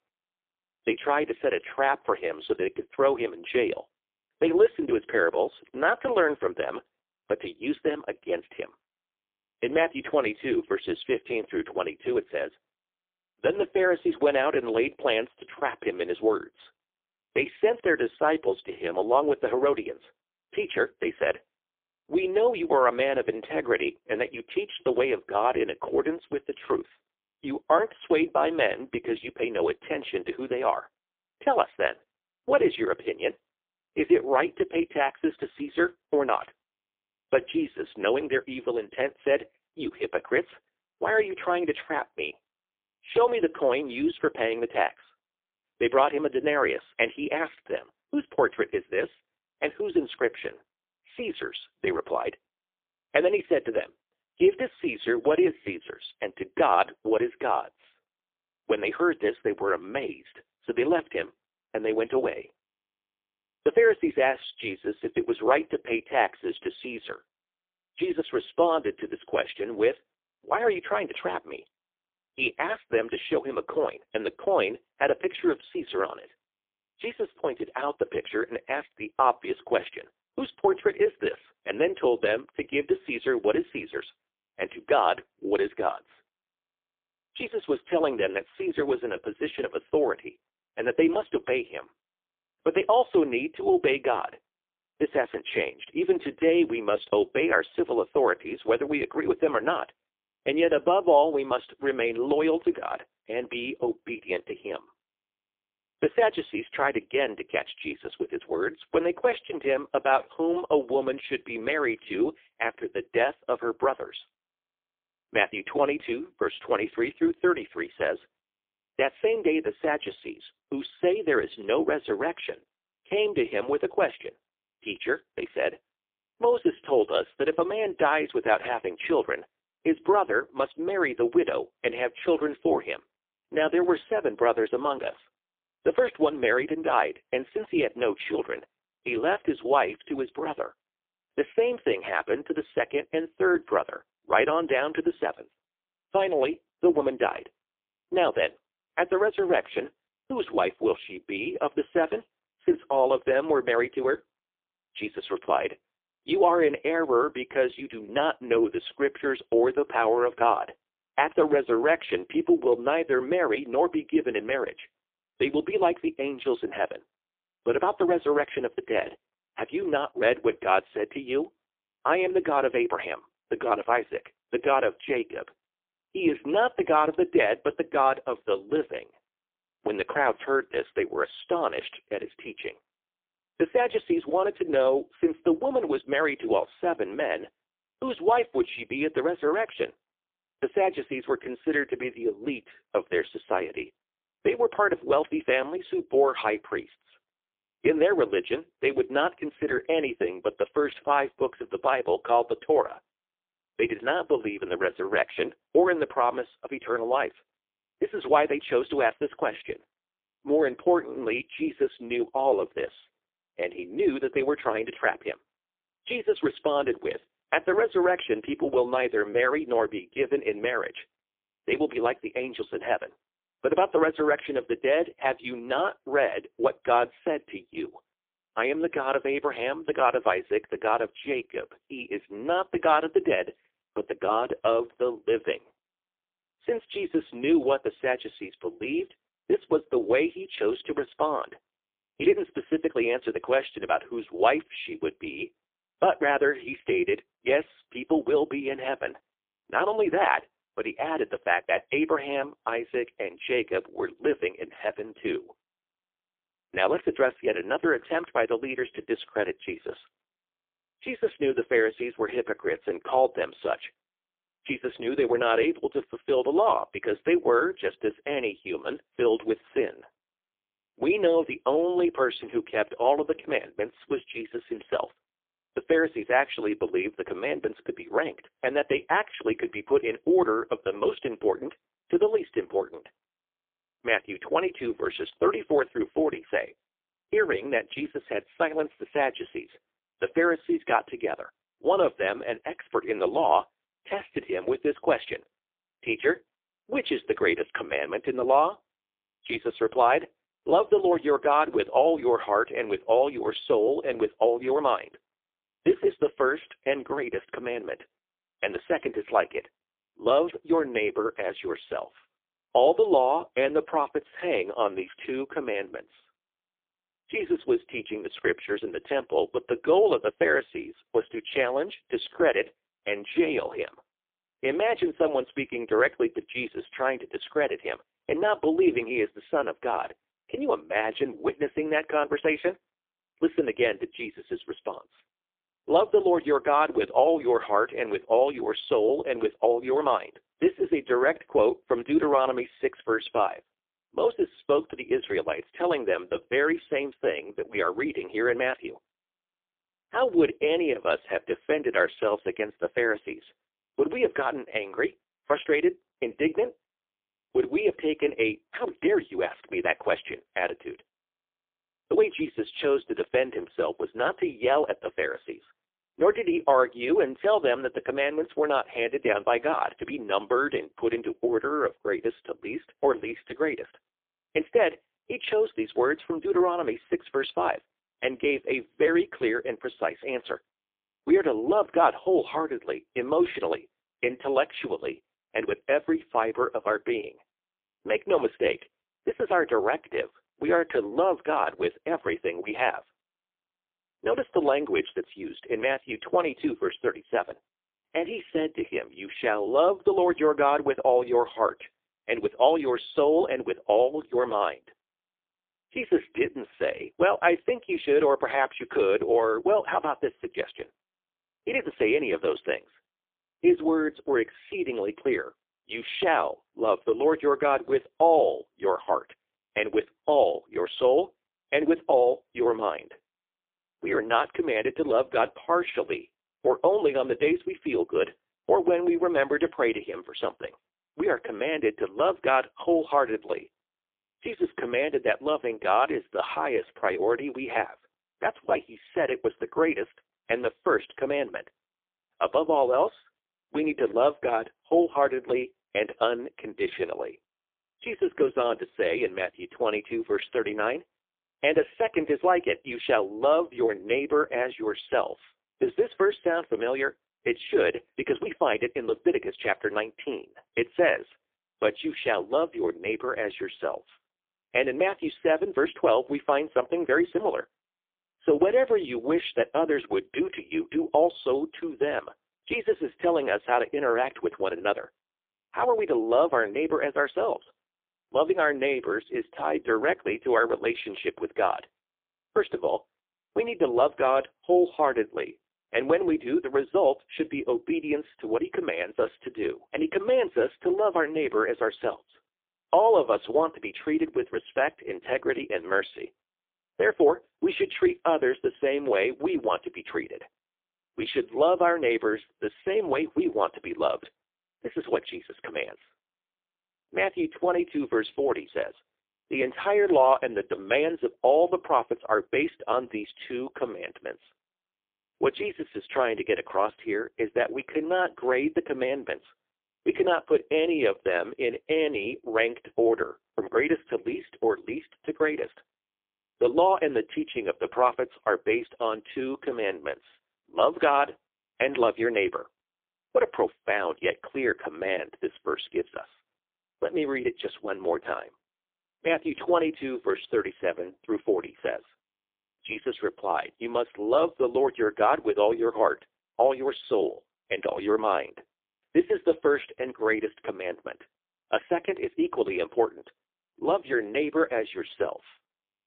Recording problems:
phone-call audio; poor line; nothing above 3.5 kHz

